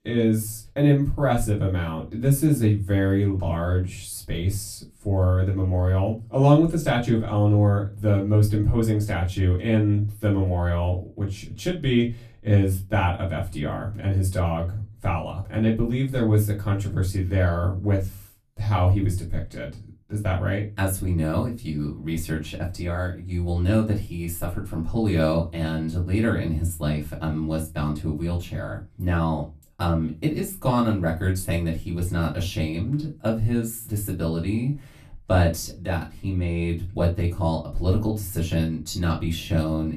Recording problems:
off-mic speech; far
room echo; very slight; dies away in 0.2 s

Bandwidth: 14.5 kHz